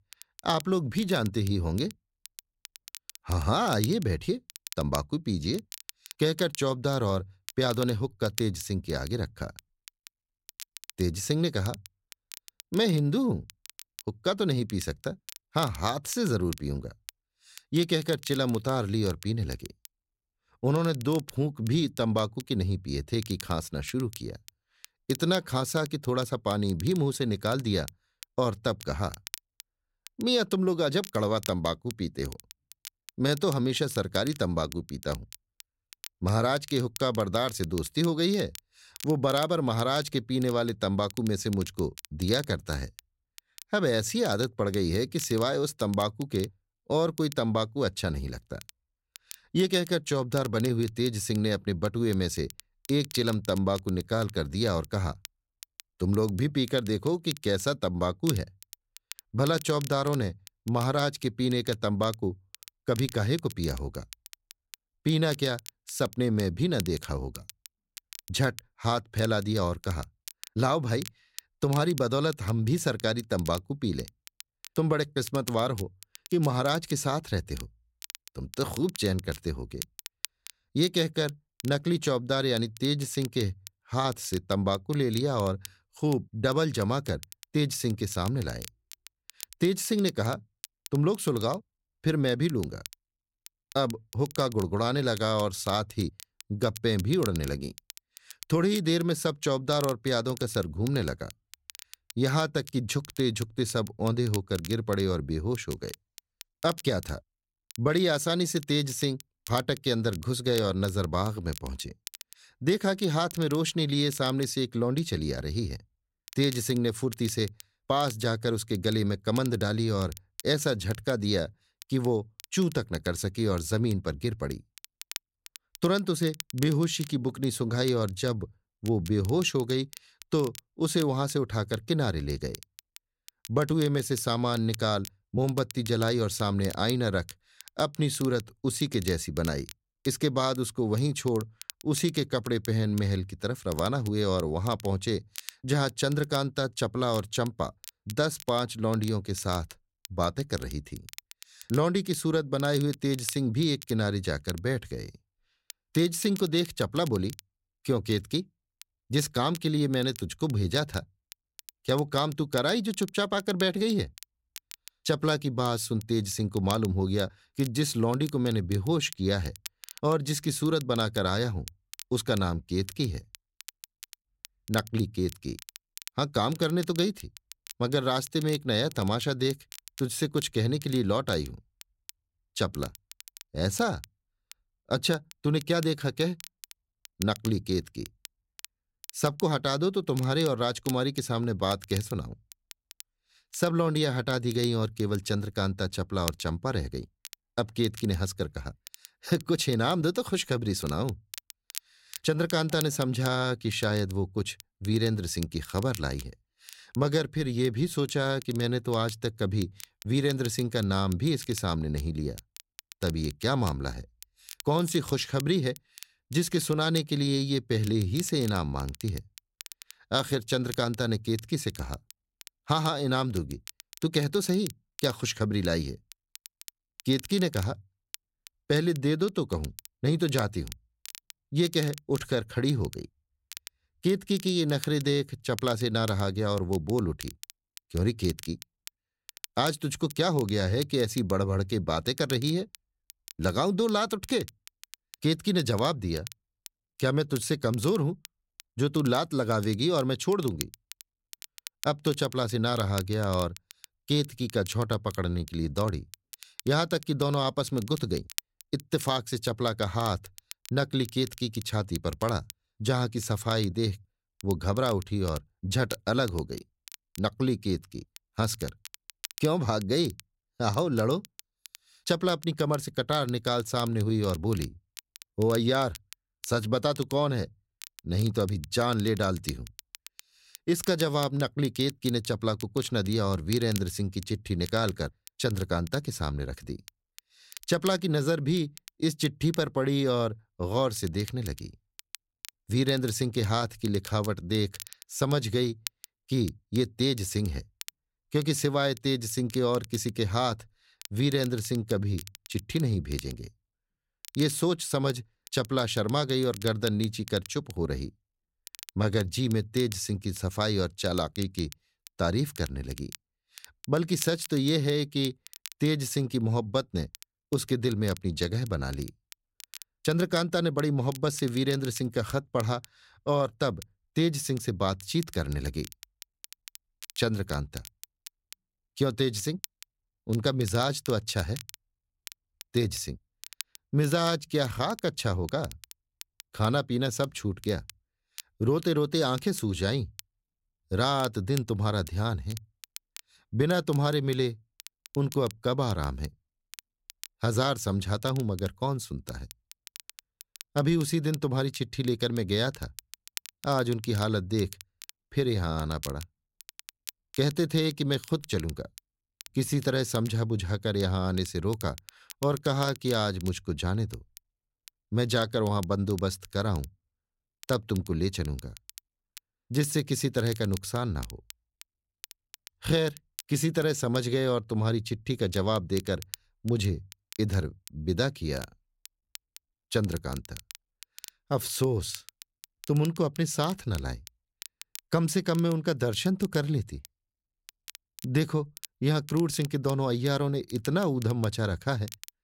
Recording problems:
crackle, like an old record; noticeable; 15 dB below the speech

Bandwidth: 16 kHz